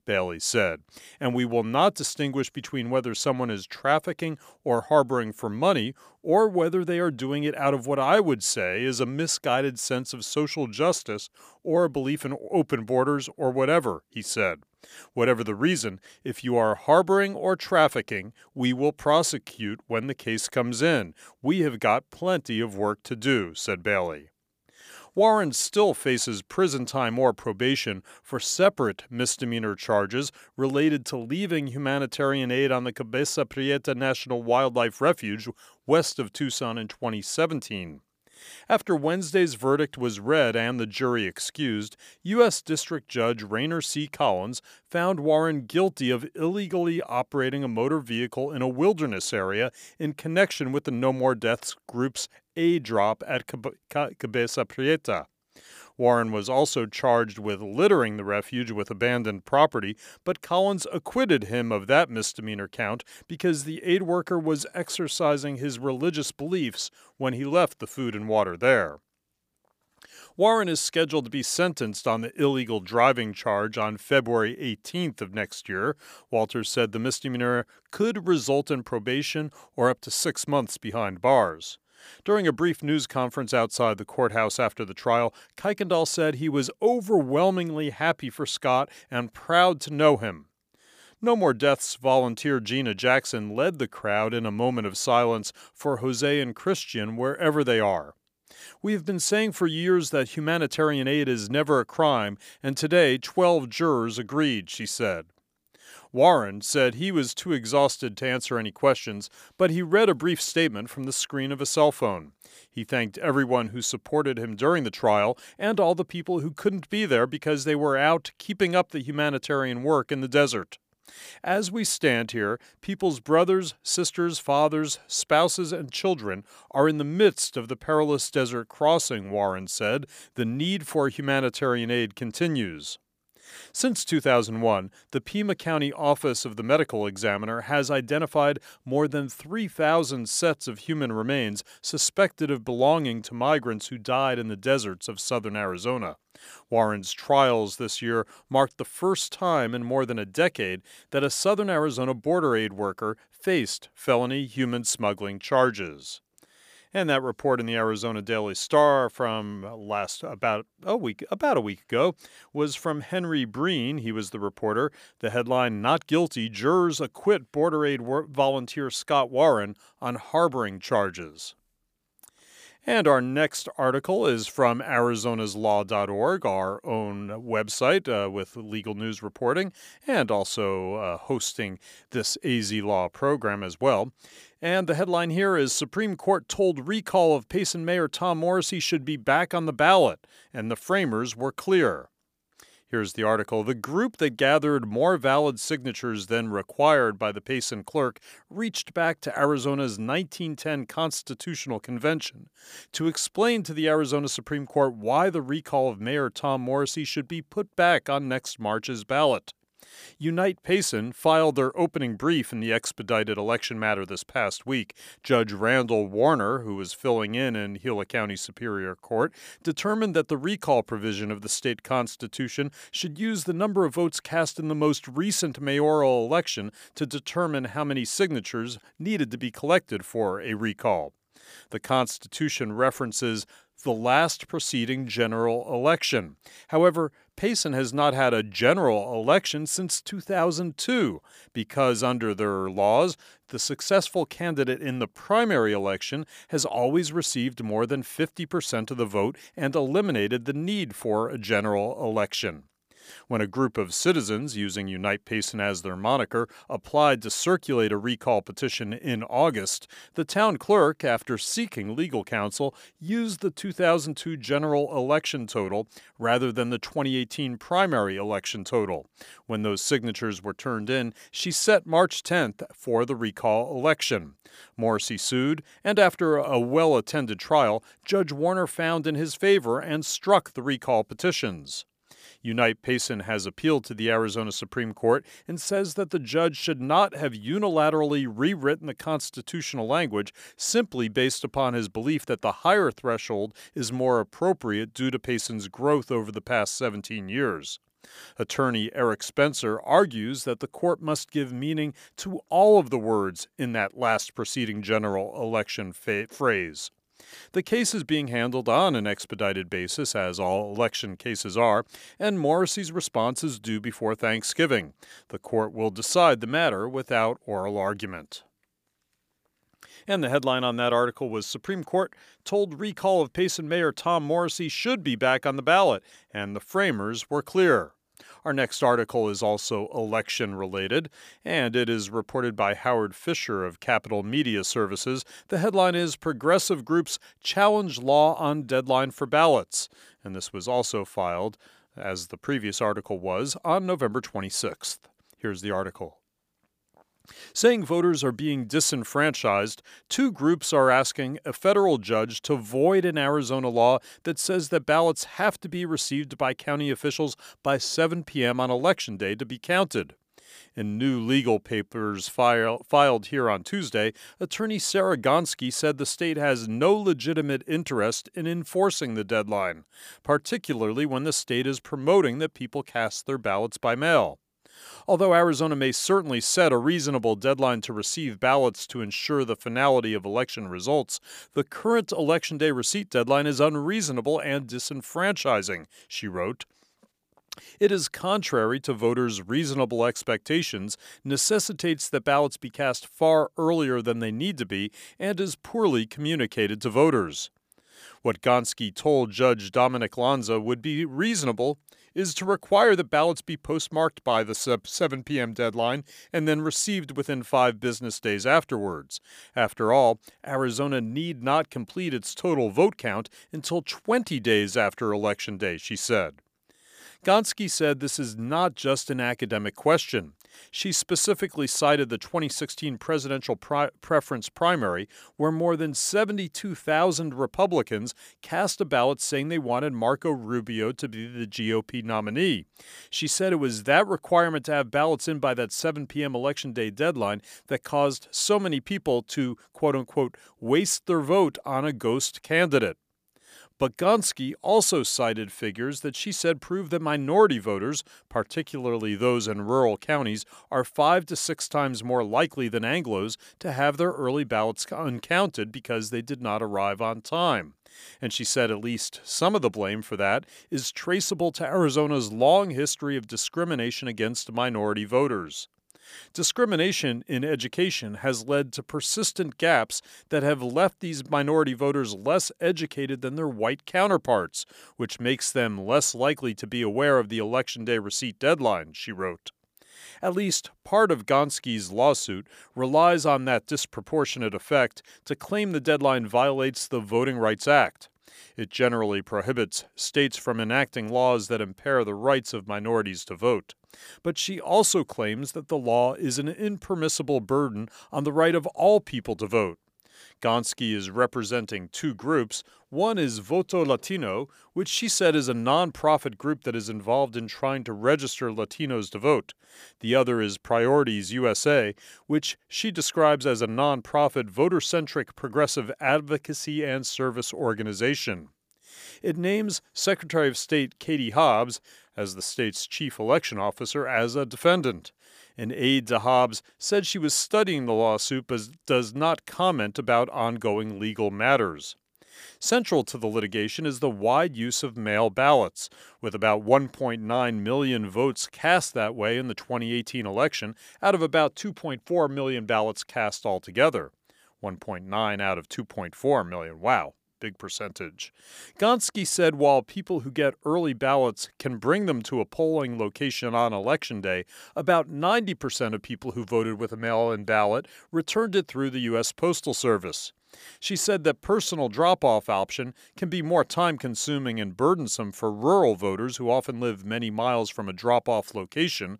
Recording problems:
none

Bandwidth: 15 kHz